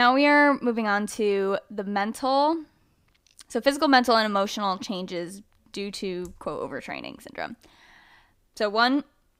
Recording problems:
abrupt cut into speech; at the start

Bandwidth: 15.5 kHz